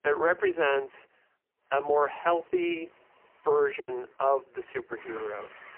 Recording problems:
phone-call audio; poor line; nothing above 3 kHz
traffic noise; faint; from 1.5 s on; 25 dB below the speech
choppy; occasionally; at 4 s; 3% of the speech affected

